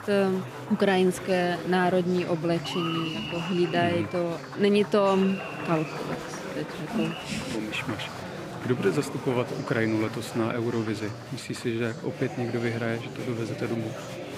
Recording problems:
murmuring crowd; loud; throughout; 8 dB below the speech

